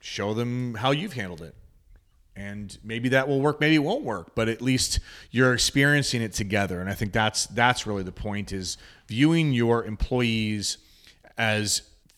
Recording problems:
none

